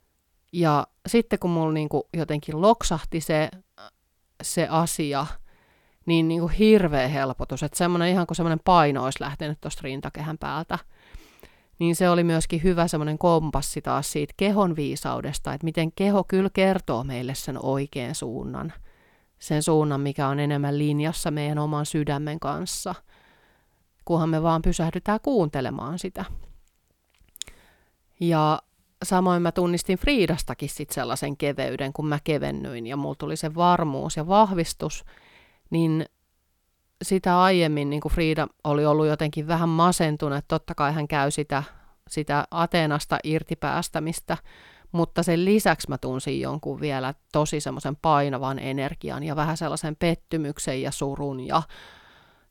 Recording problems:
none

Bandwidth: 18 kHz